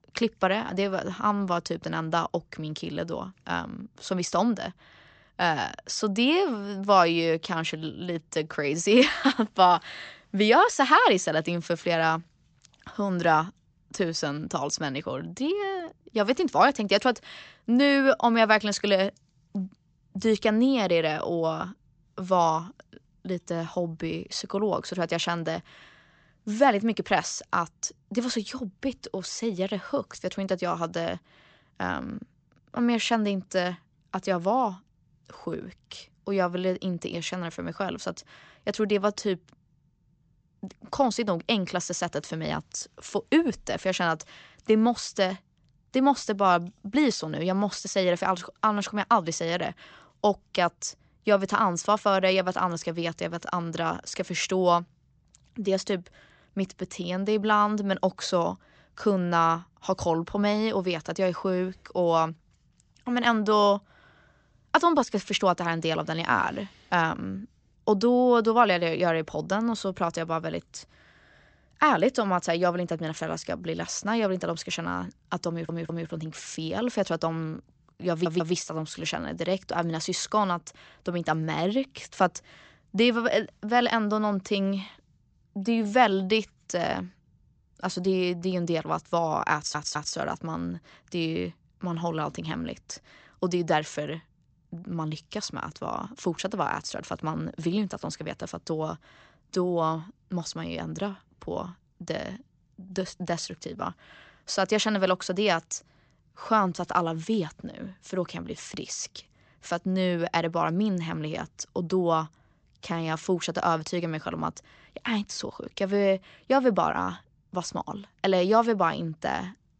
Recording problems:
high frequencies cut off; noticeable; nothing above 8 kHz
audio stuttering; at 1:15, at 1:18 and at 1:30

